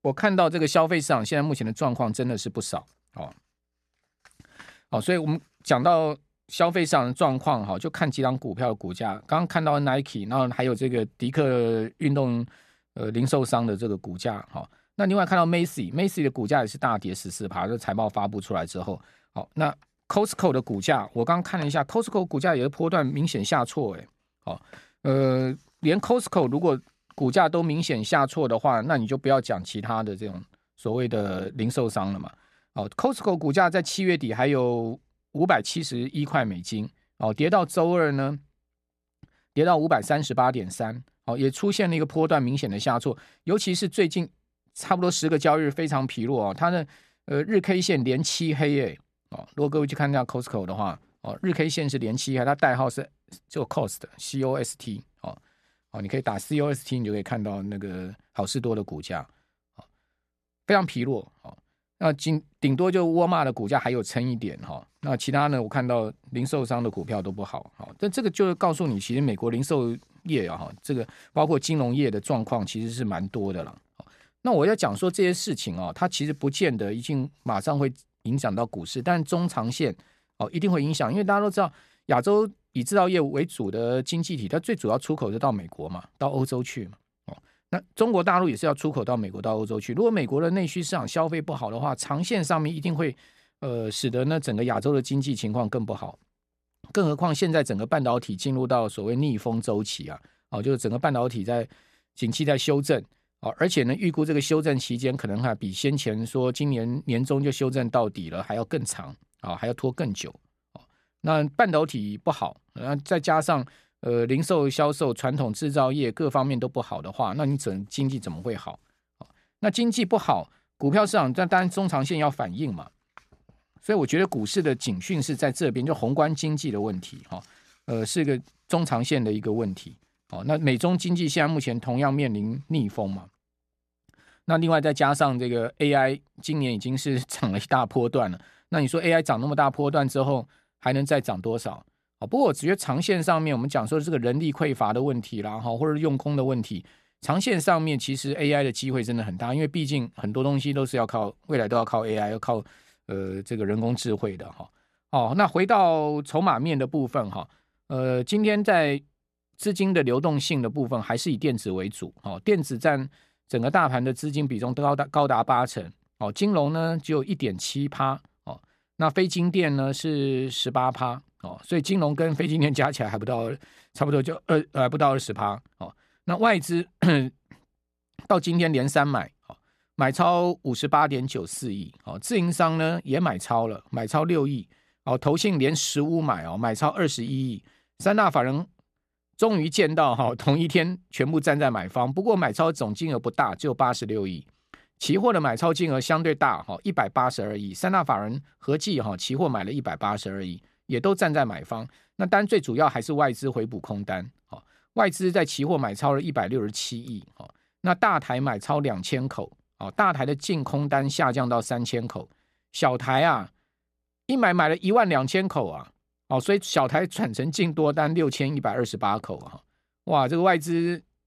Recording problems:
none

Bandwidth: 14 kHz